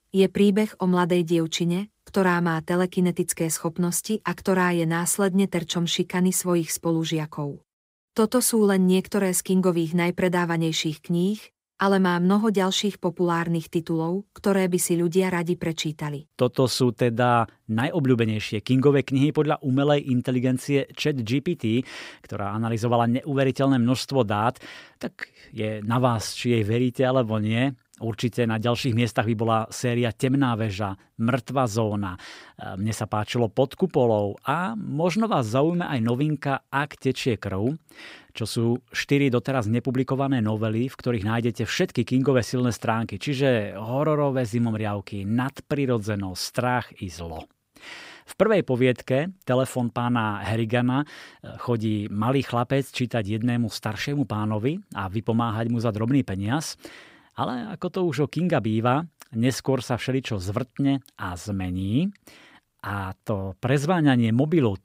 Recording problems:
none

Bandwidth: 15.5 kHz